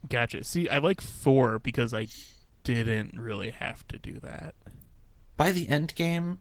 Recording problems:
garbled, watery; slightly

